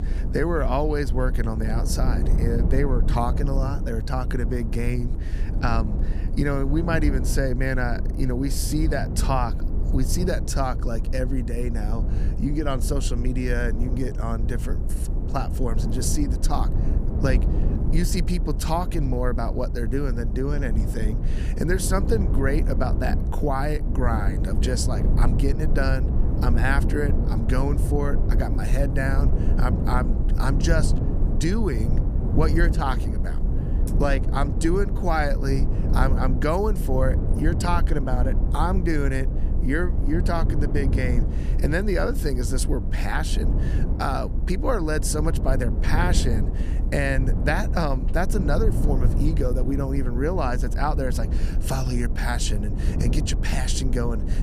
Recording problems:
low rumble; loud; throughout; 9 dB below the speech

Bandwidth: 14.5 kHz